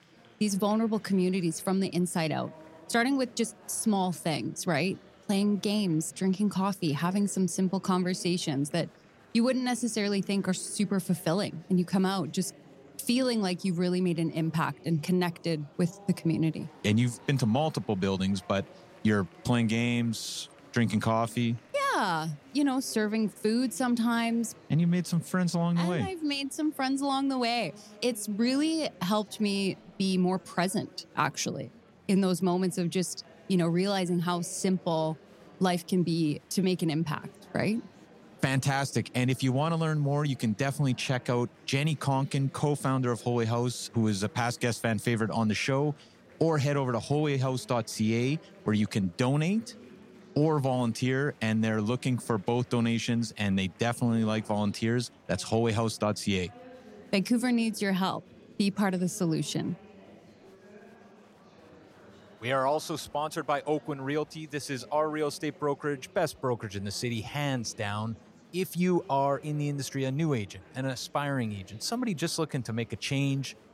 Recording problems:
murmuring crowd; faint; throughout; 25 dB below the speech

